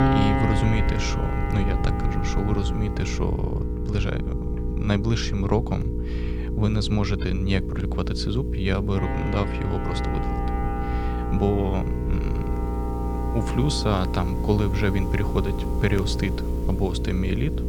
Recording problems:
electrical hum; loud; throughout; 60 Hz, 6 dB below the speech
background music; loud; throughout; 7 dB below the speech
low rumble; noticeable; throughout; 15 dB below the speech

